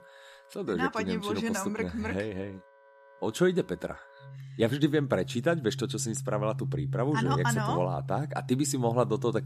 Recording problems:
background music; loud; throughout; 6 dB below the speech

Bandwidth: 14.5 kHz